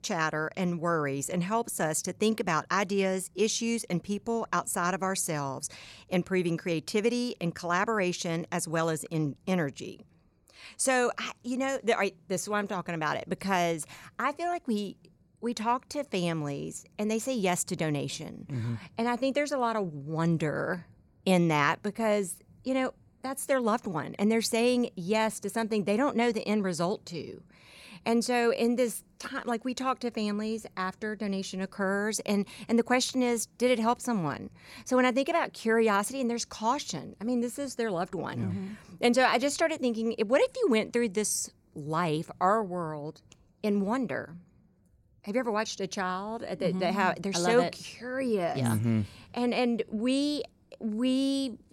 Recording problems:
none

